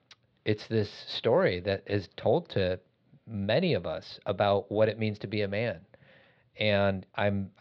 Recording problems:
muffled; slightly; fading above 4 kHz

